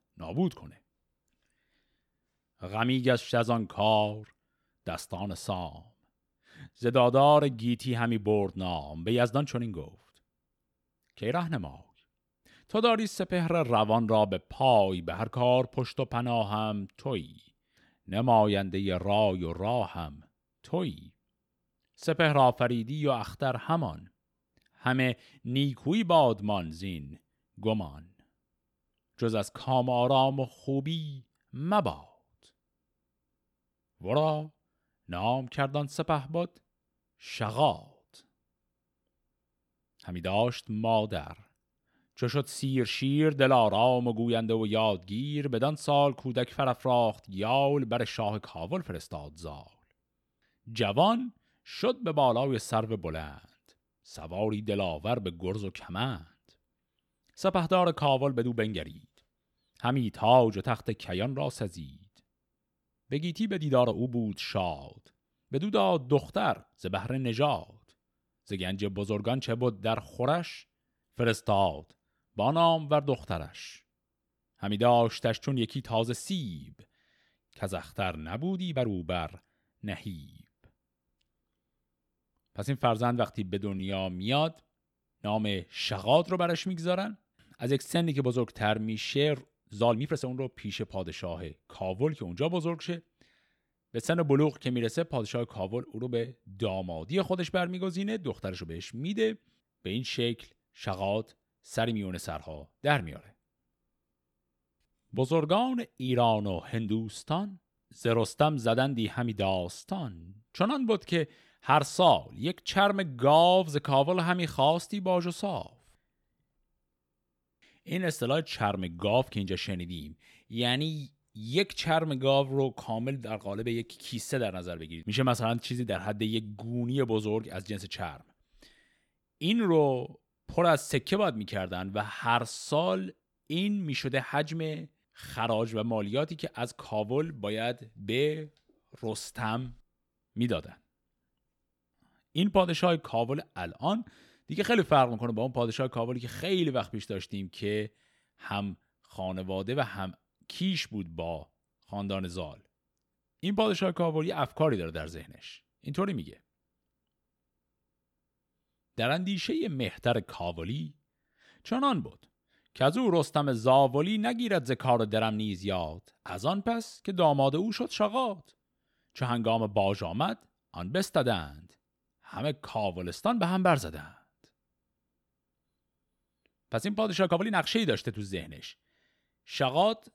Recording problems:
uneven, jittery; strongly; from 30 s to 2:58

